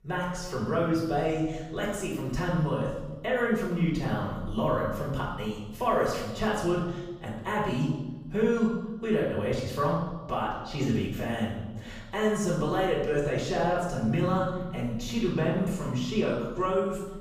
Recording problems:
off-mic speech; far
room echo; noticeable; dies away in 1.1 s

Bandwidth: 15.5 kHz